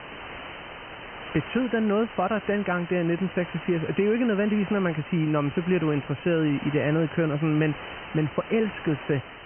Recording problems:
high frequencies cut off; severe; nothing above 3 kHz
hiss; noticeable; throughout; 15 dB below the speech

